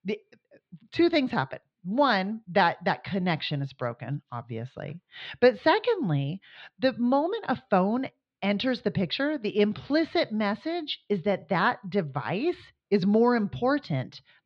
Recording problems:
muffled; very slightly; fading above 4 kHz

